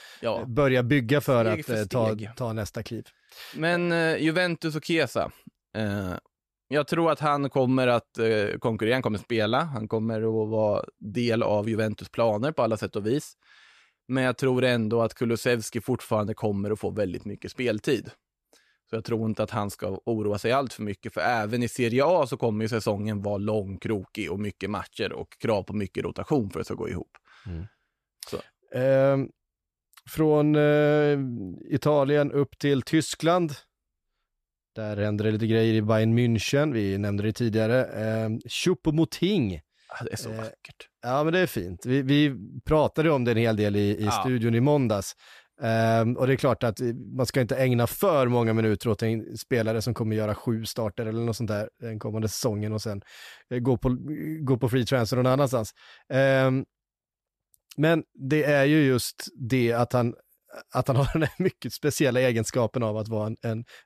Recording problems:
none

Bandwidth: 14.5 kHz